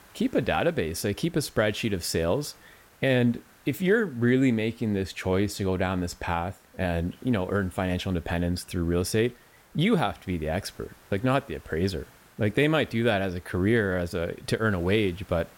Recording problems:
hiss; faint; throughout; 30 dB below the speech

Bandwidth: 16.5 kHz